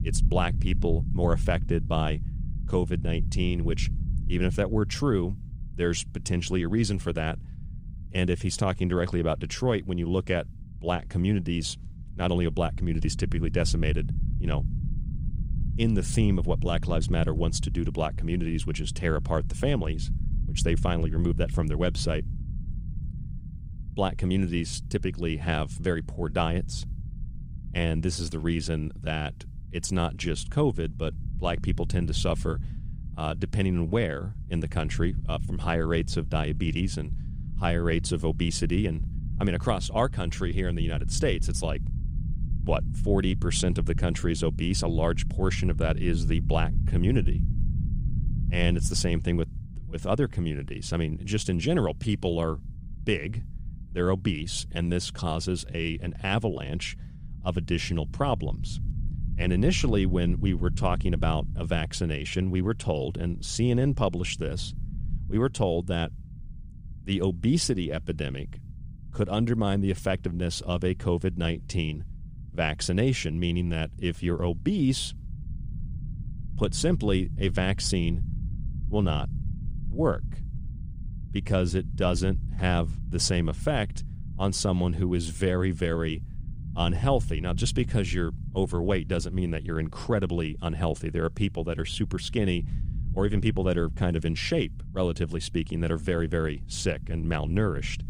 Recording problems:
low rumble; noticeable; throughout; 20 dB below the speech

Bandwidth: 15.5 kHz